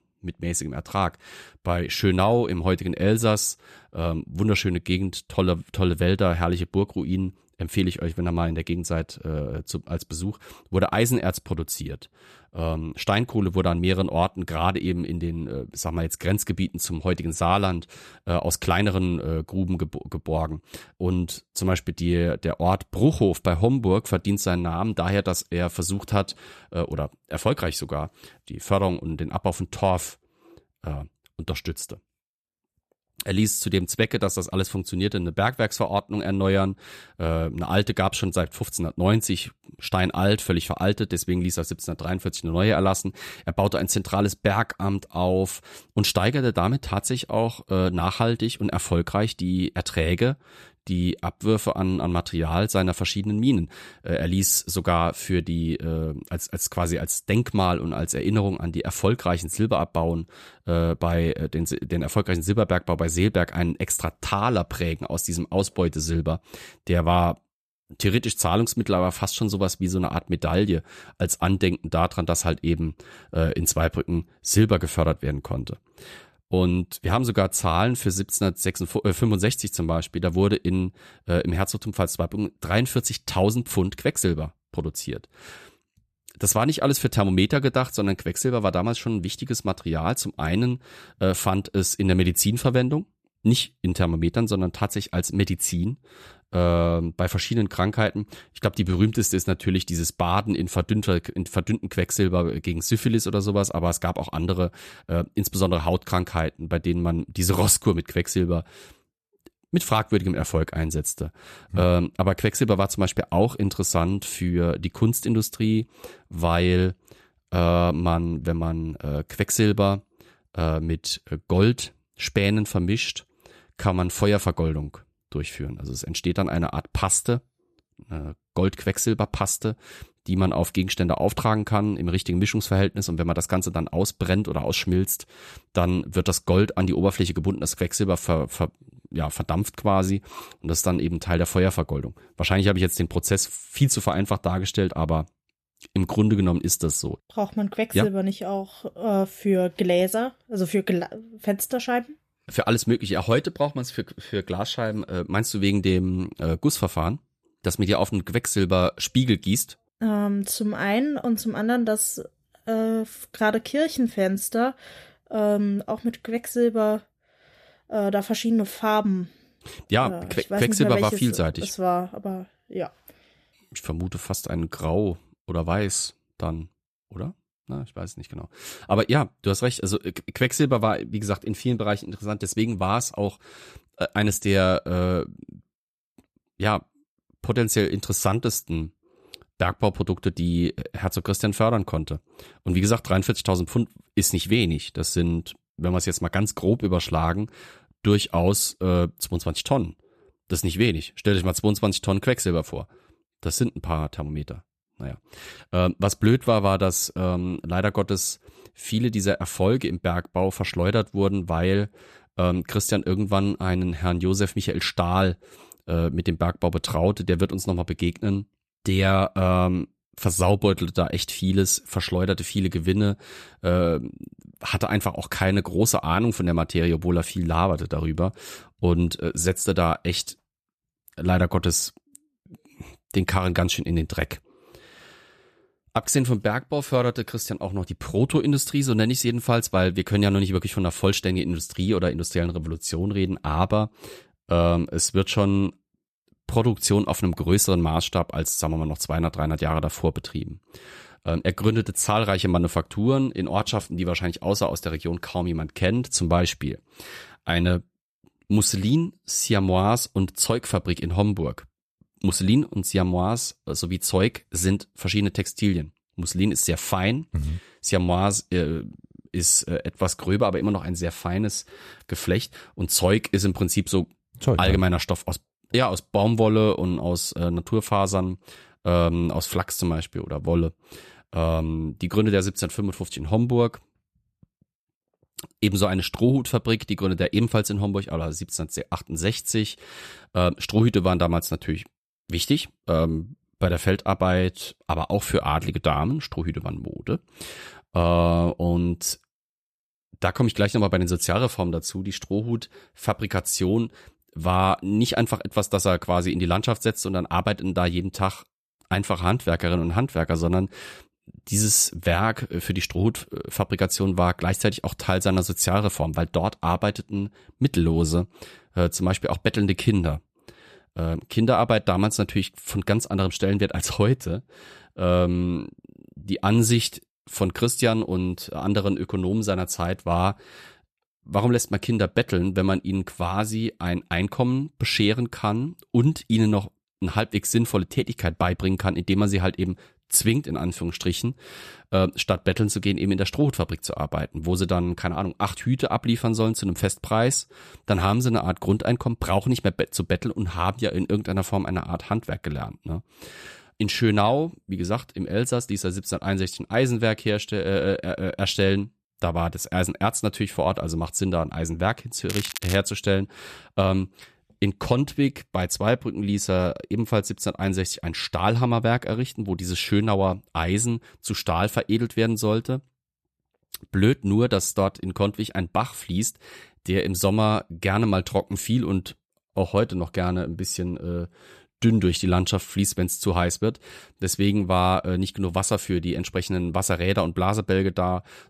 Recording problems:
crackling; loud; at 6:02; 9 dB below the speech

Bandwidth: 14.5 kHz